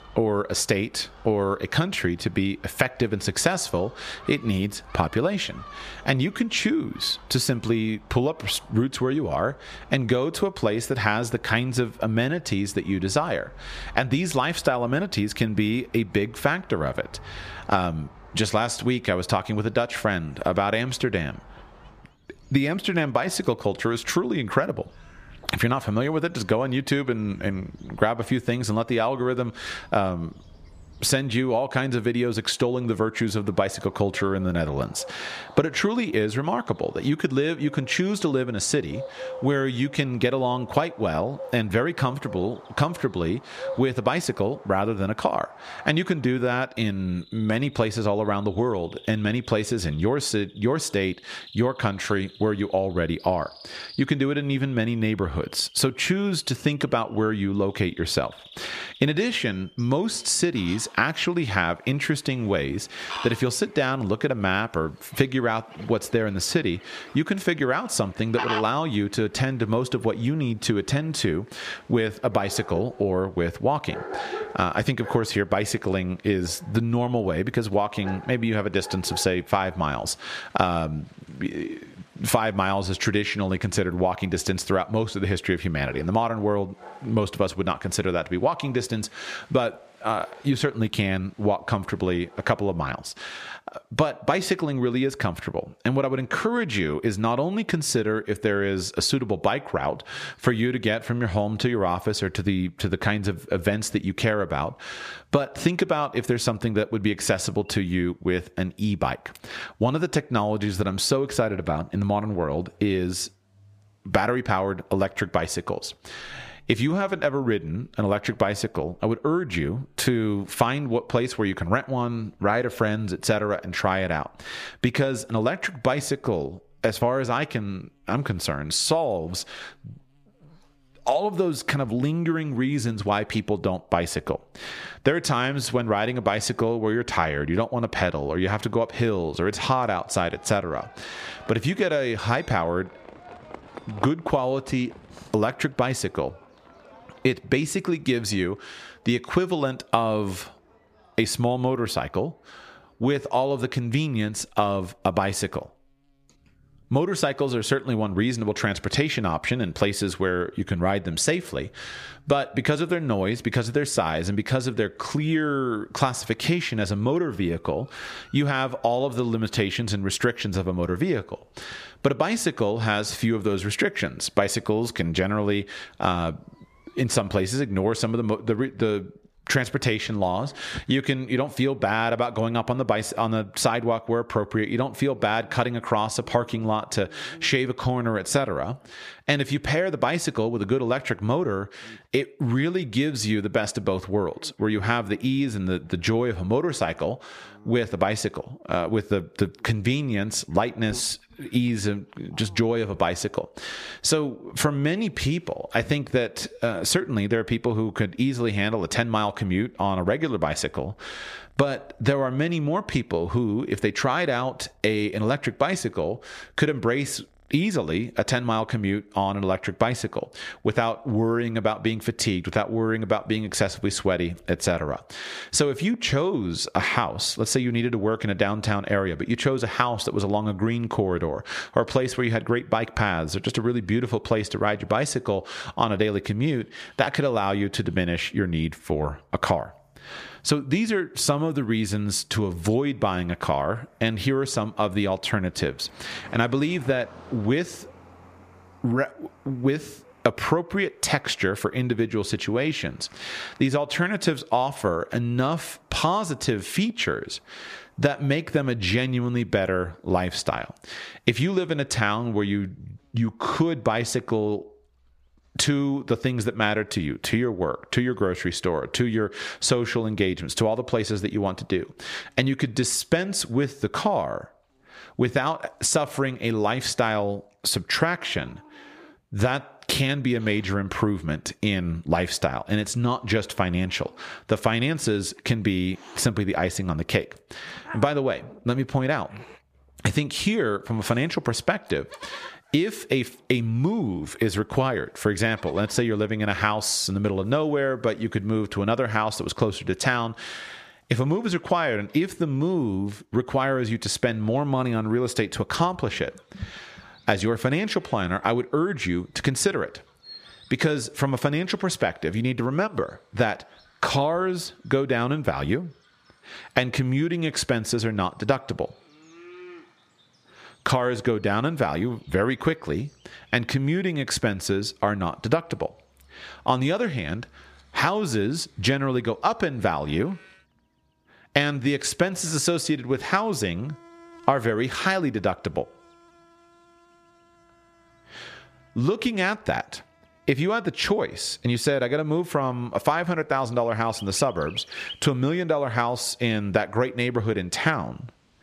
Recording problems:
squashed, flat; somewhat, background pumping
animal sounds; faint; throughout; 20 dB below the speech

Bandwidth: 14.5 kHz